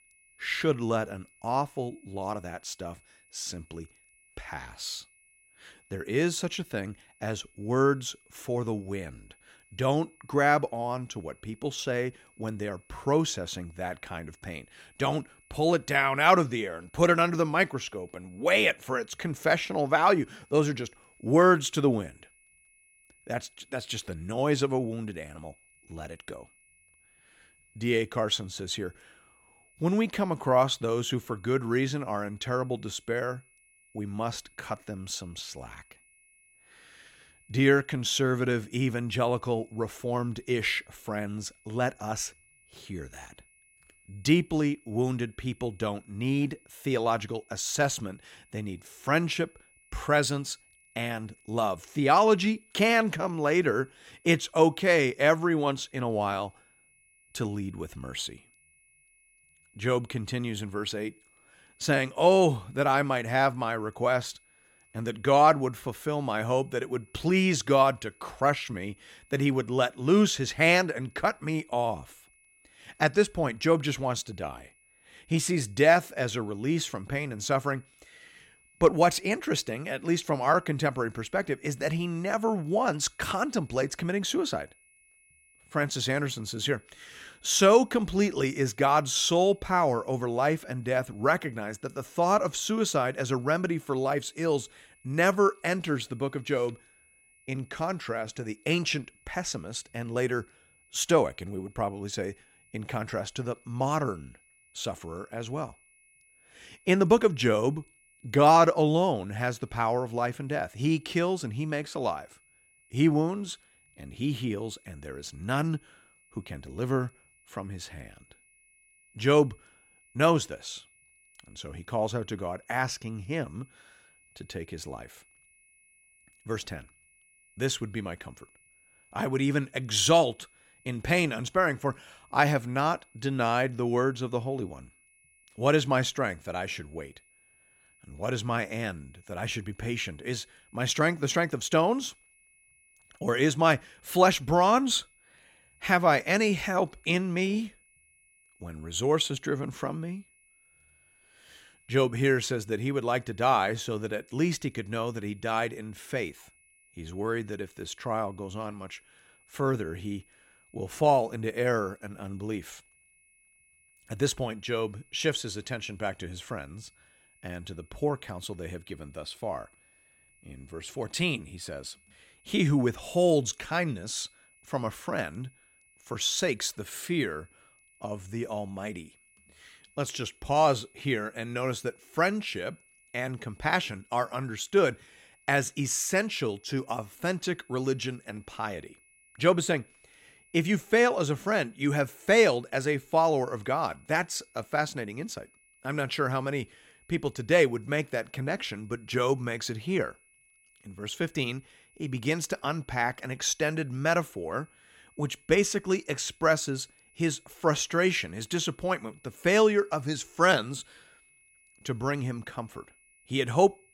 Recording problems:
high-pitched whine; faint; throughout; 2.5 kHz, 30 dB below the speech

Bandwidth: 16 kHz